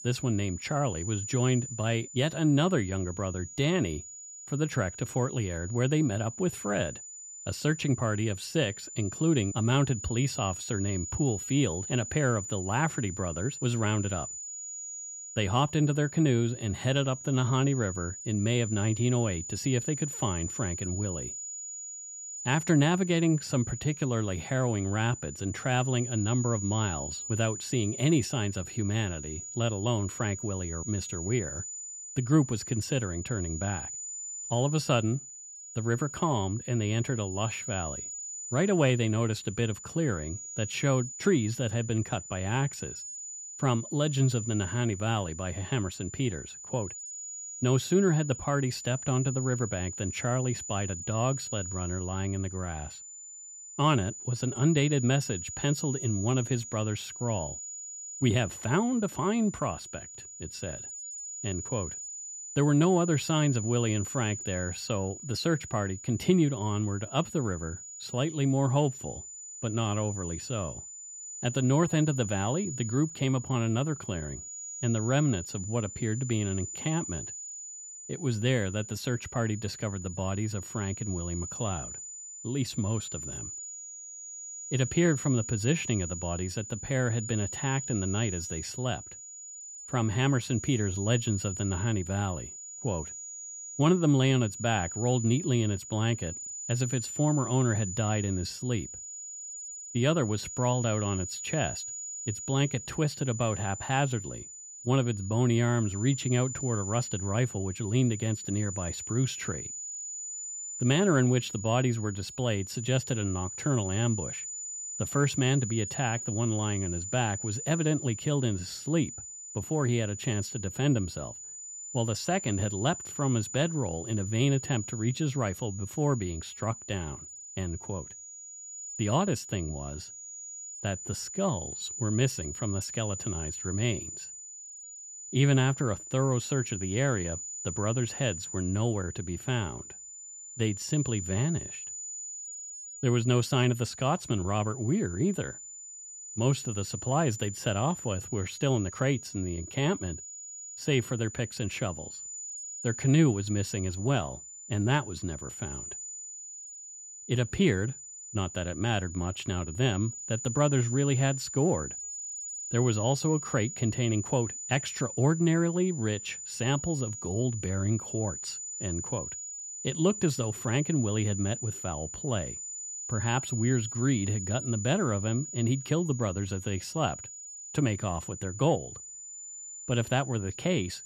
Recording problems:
high-pitched whine; loud; throughout; 7 kHz, 9 dB below the speech

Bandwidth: 14.5 kHz